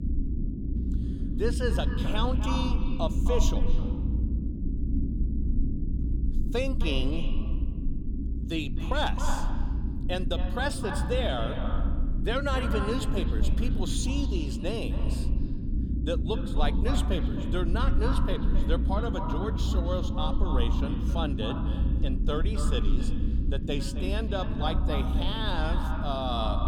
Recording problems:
echo of what is said; strong; throughout; 260 ms later, 8 dB below the speech
low rumble; loud; throughout; 8 dB below the speech

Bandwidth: 18 kHz